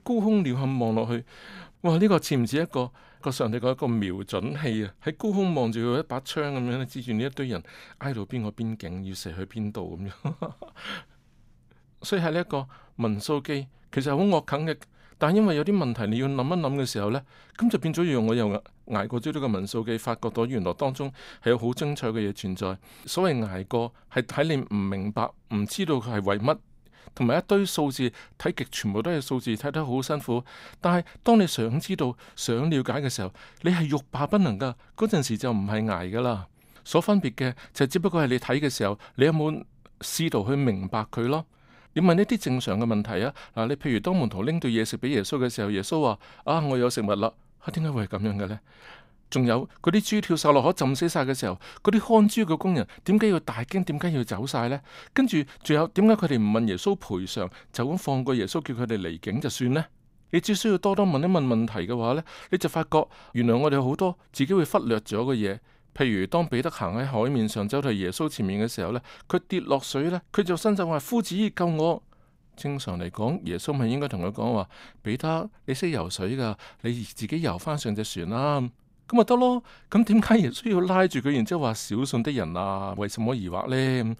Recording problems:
none

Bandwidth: 15.5 kHz